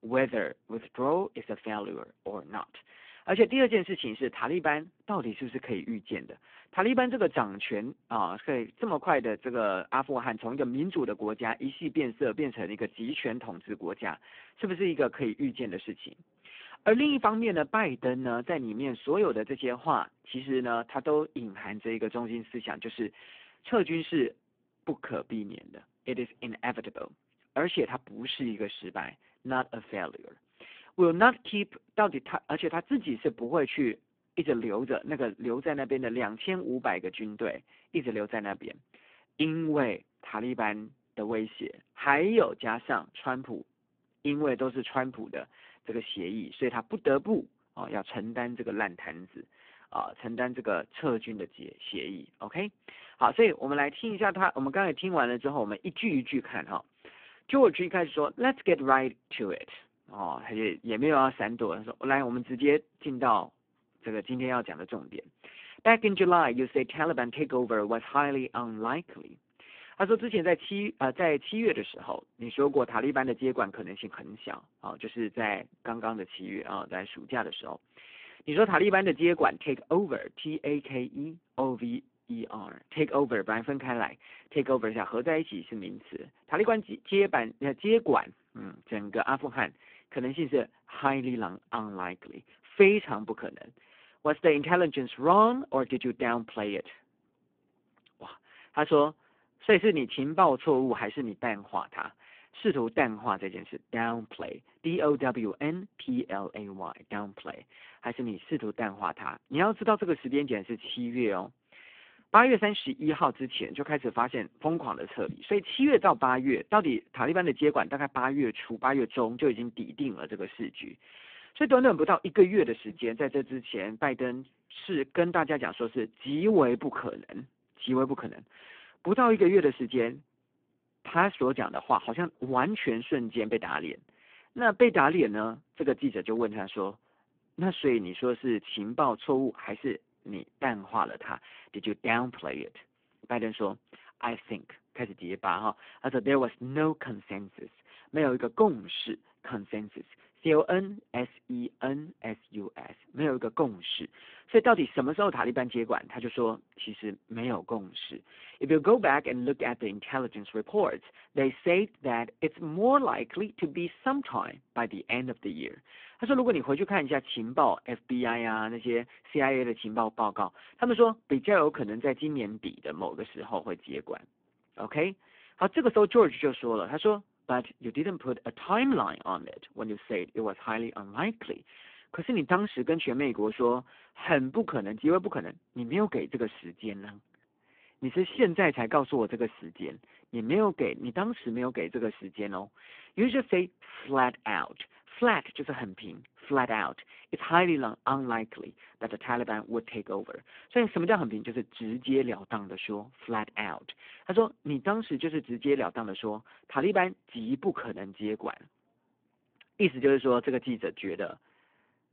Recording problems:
phone-call audio; poor line

